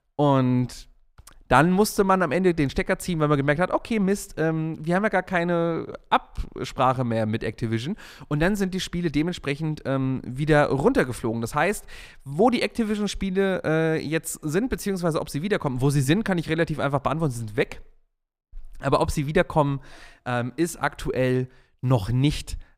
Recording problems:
none

